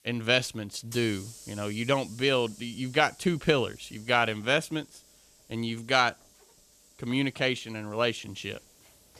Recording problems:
hiss; faint; throughout; 20 dB below the speech

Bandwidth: 14 kHz